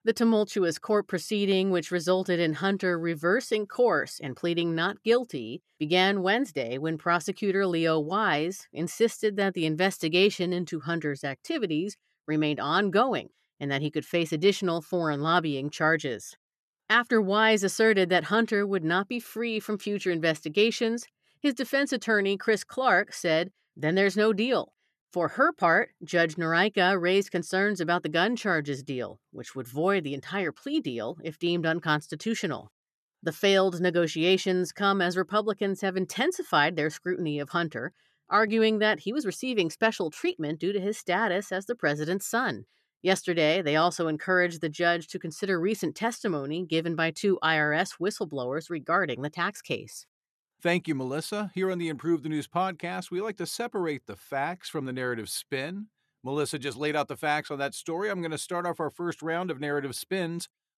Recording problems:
none

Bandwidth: 13.5 kHz